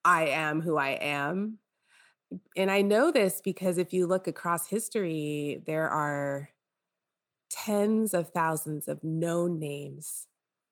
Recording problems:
none

